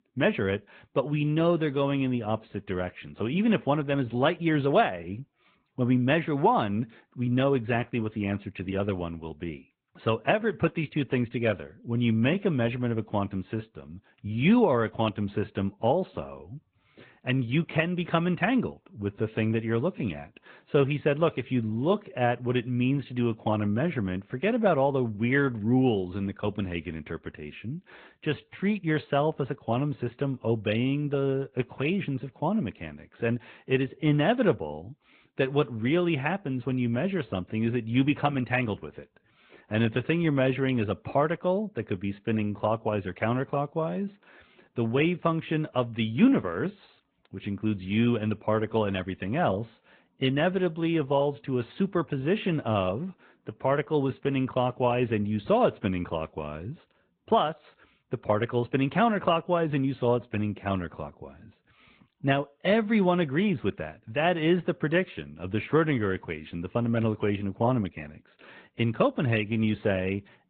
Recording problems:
high frequencies cut off; severe; nothing above 4 kHz
garbled, watery; slightly

